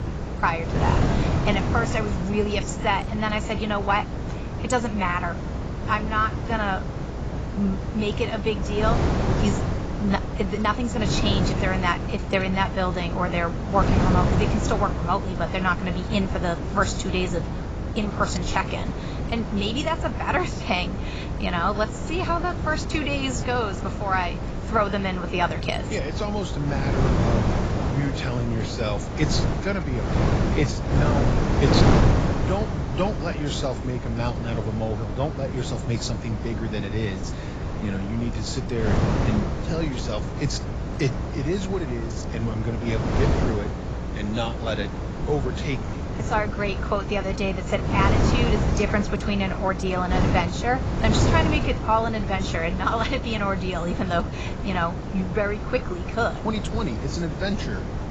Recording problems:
garbled, watery; badly; nothing above 7.5 kHz
wind noise on the microphone; heavy; 5 dB below the speech
electrical hum; faint; throughout; 60 Hz, 20 dB below the speech

